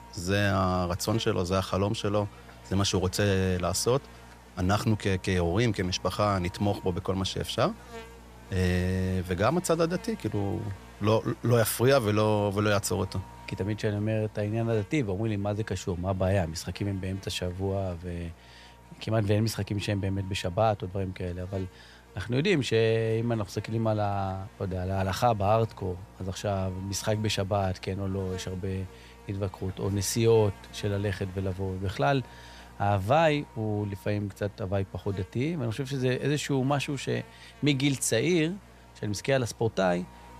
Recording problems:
electrical hum; faint; throughout; 60 Hz, 20 dB below the speech

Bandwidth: 14.5 kHz